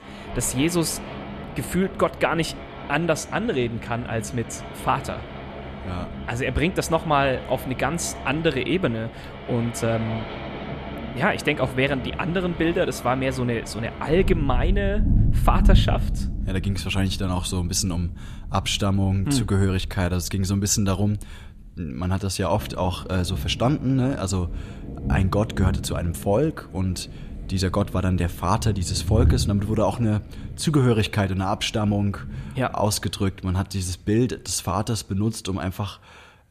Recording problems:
rain or running water; loud; throughout; 7 dB below the speech

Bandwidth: 14.5 kHz